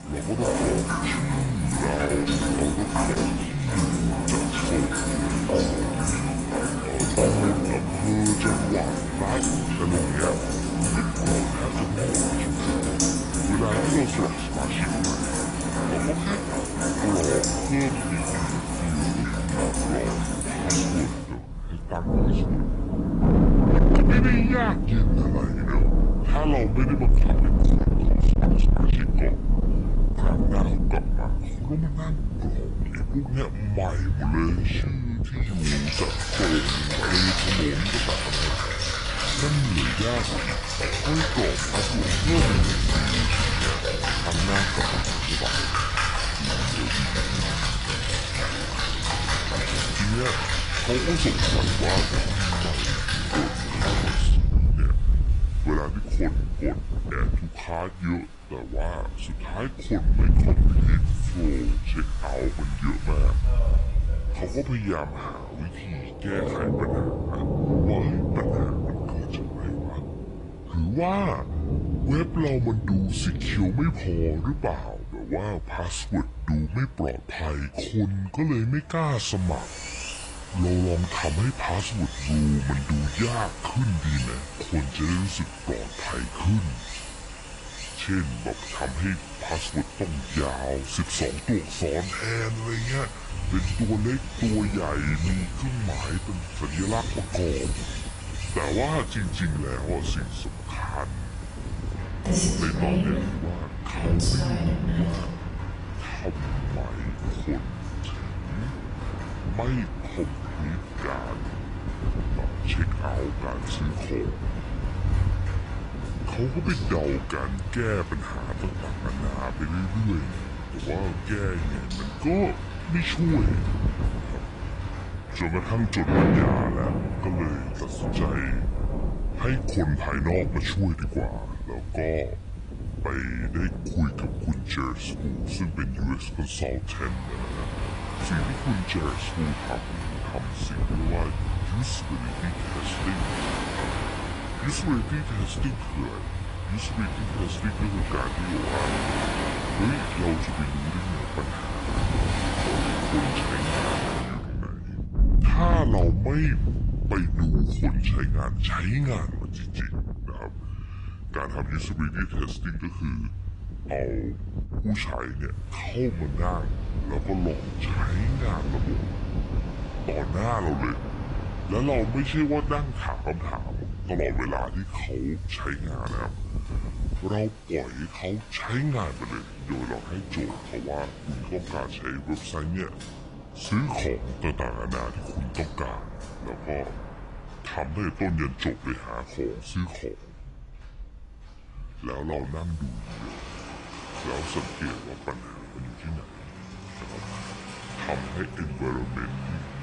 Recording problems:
wrong speed and pitch; too slow and too low; 0.7 times normal speed
distortion; slight; 1.2% of the sound clipped
garbled, watery; slightly; nothing above 10.5 kHz
rain or running water; very loud; throughout; 2 dB above the speech
wind noise on the microphone; occasional gusts; from 23 to 57 s and from 1:33 to 2:57; 15 dB below the speech

